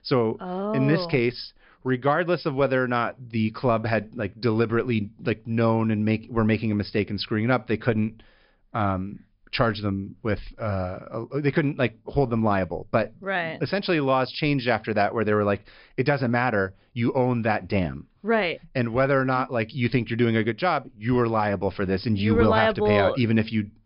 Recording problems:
high frequencies cut off; noticeable; nothing above 5.5 kHz

